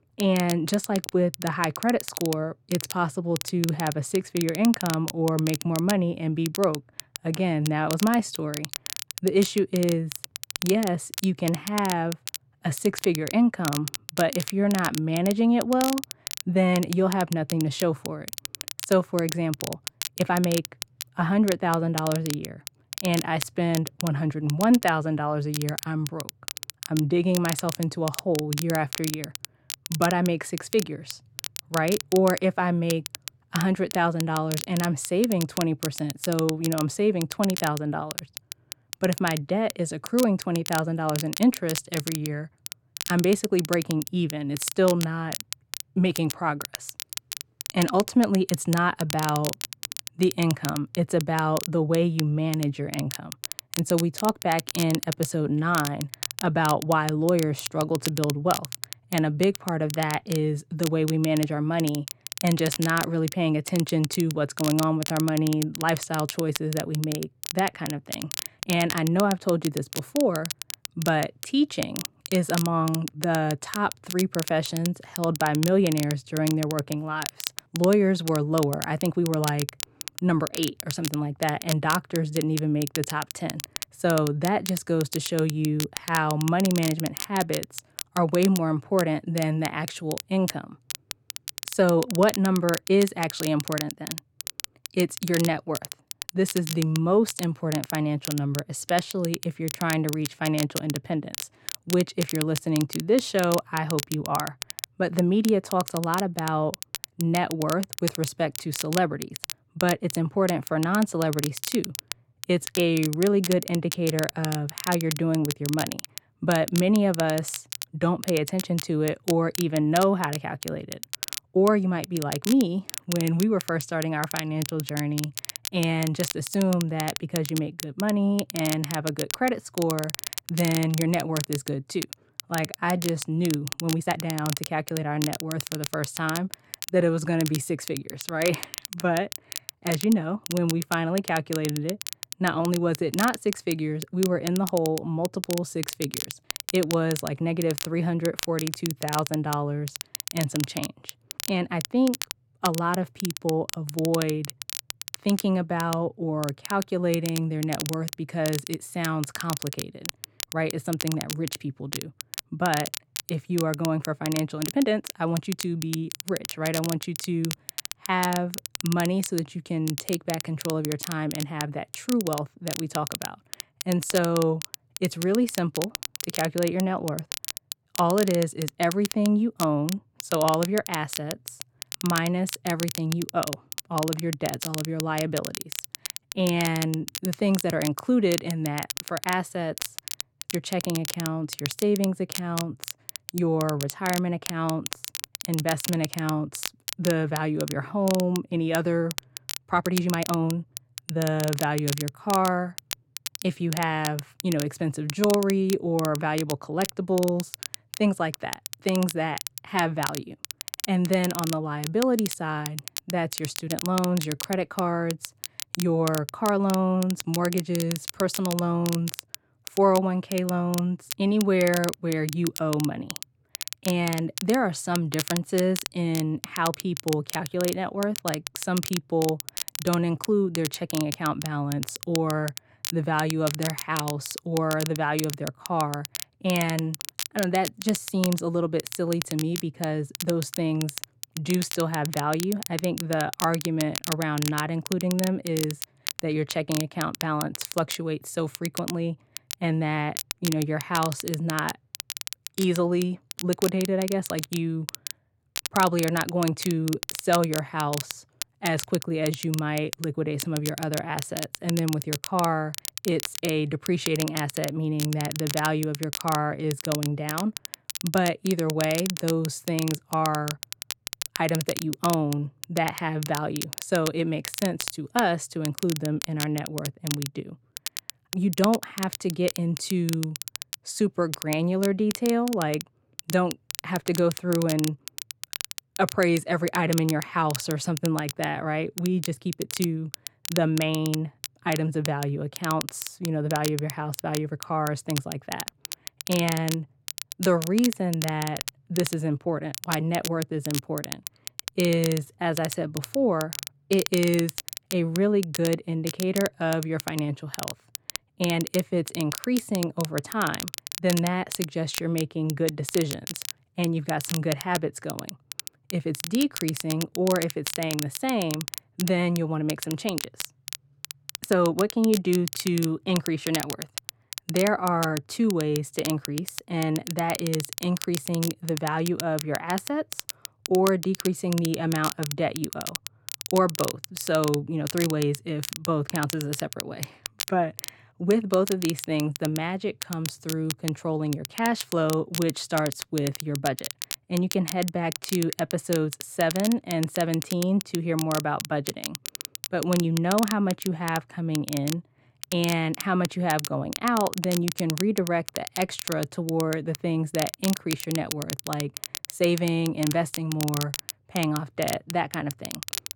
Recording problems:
muffled; slightly; fading above 3.5 kHz
crackle, like an old record; loud; 8 dB below the speech
uneven, jittery; strongly; from 20 s to 5:38

